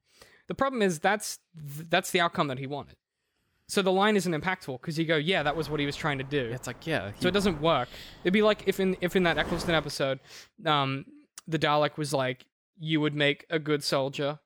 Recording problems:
wind noise on the microphone; occasional gusts; from 5.5 to 10 s; 20 dB below the speech

